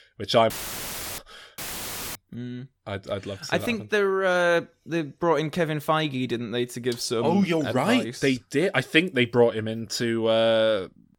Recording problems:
audio cutting out; filled with static; at 0.5 s for 0.5 s and at 1.5 s for 0.5 s

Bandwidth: 18 kHz